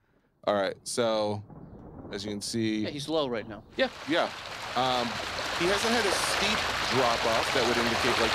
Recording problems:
rain or running water; very loud; throughout; 1 dB above the speech

